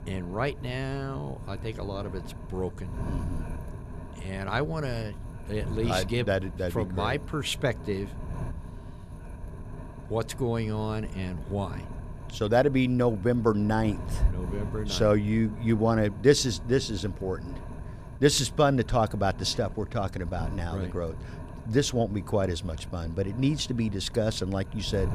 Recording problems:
wind noise on the microphone; occasional gusts; 20 dB below the speech

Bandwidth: 14.5 kHz